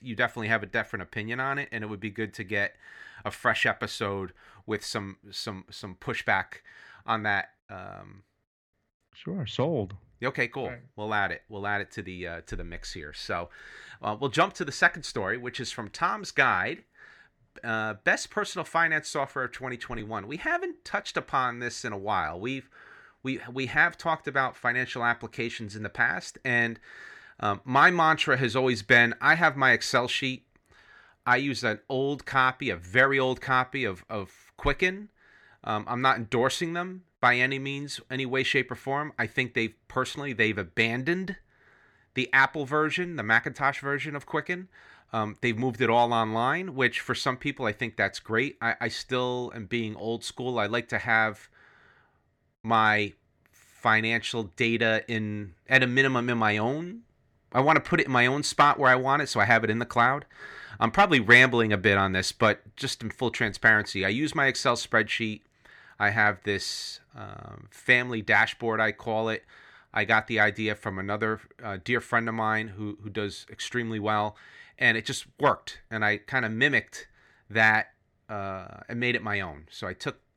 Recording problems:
none

